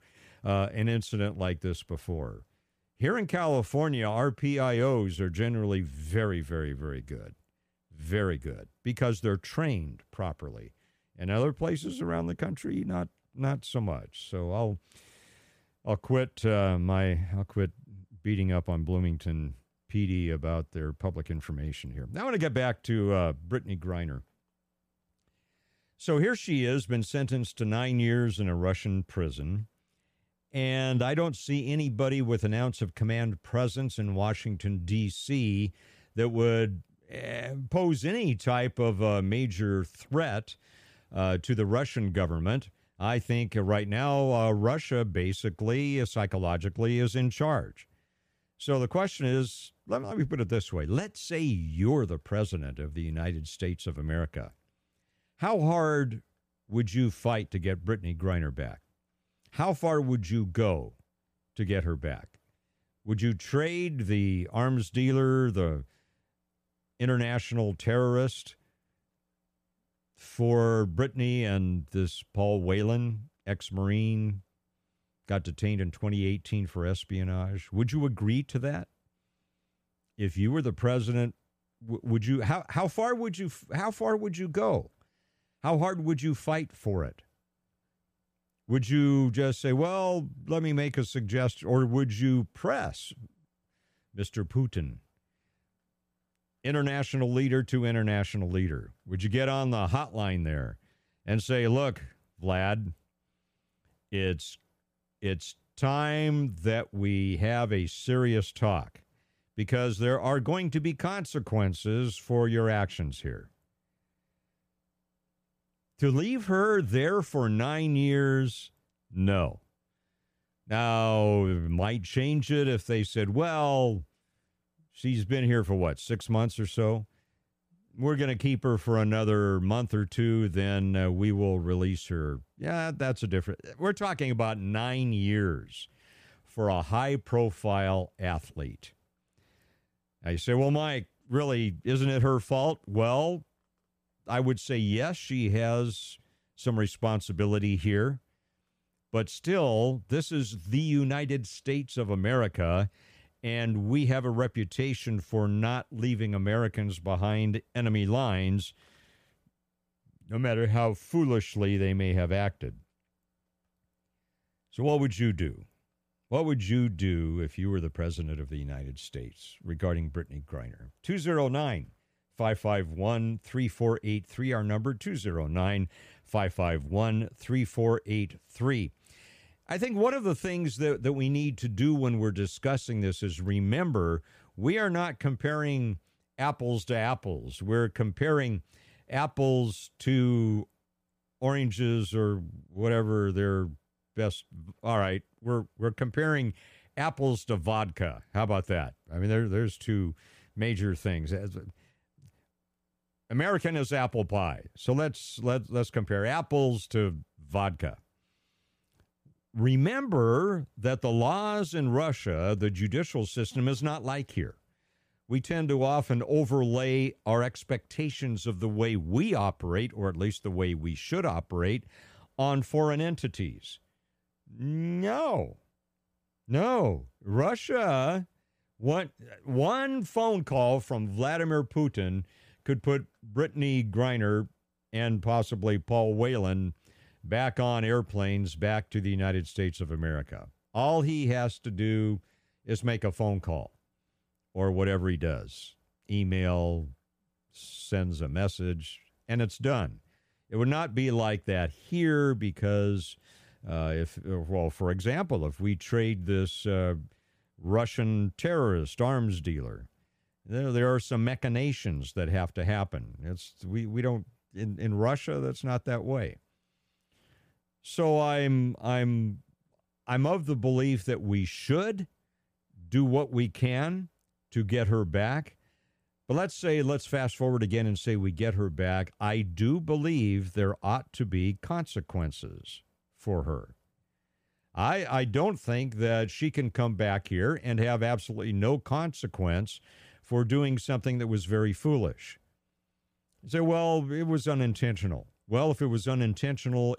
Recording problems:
none

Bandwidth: 15 kHz